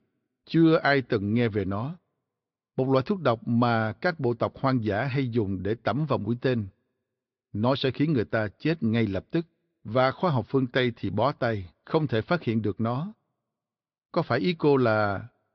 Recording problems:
high frequencies cut off; noticeable; nothing above 5.5 kHz

